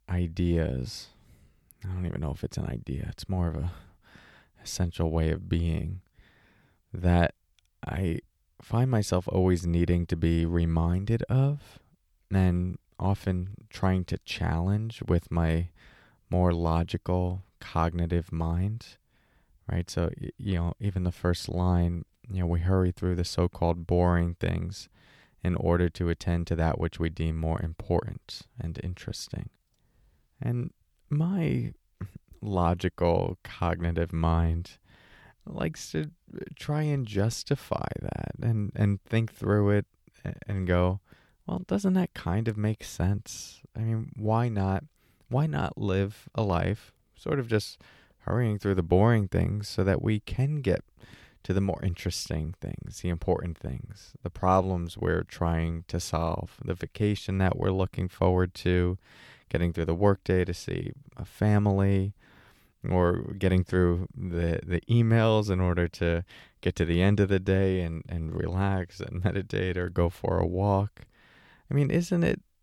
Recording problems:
none

